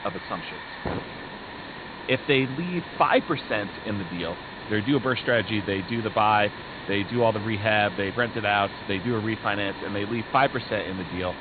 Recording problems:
high frequencies cut off; severe; nothing above 4.5 kHz
hiss; noticeable; throughout; 10 dB below the speech

